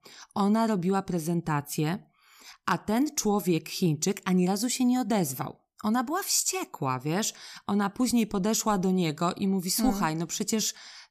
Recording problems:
none

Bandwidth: 14.5 kHz